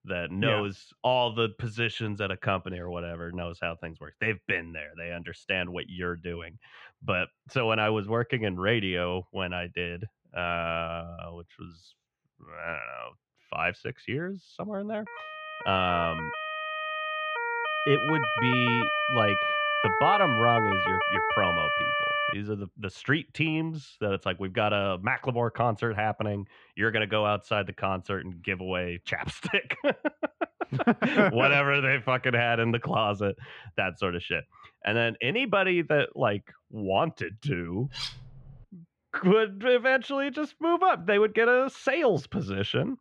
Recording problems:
muffled; very; fading above 3 kHz
siren; loud; from 15 to 22 s; peak 3 dB above the speech
clattering dishes; noticeable; at 38 s; peak 7 dB below the speech

